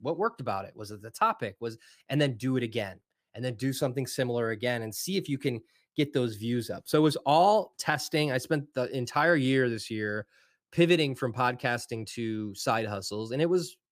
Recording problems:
none

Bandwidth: 15 kHz